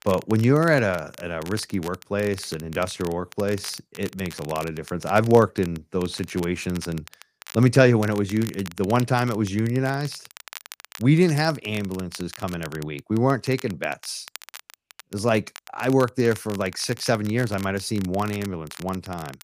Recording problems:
crackle, like an old record; noticeable; 20 dB below the speech

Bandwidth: 15 kHz